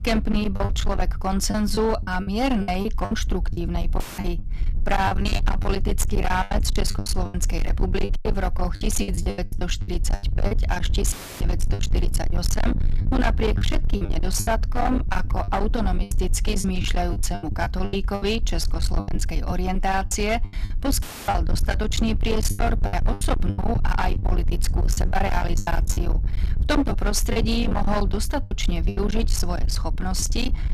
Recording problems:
distortion; heavy; 30% of the sound clipped
low rumble; loud; throughout; 9 dB below the speech
choppy; very; 12% of the speech affected
audio cutting out; filled with static; at 4 s, at 11 s and at 21 s

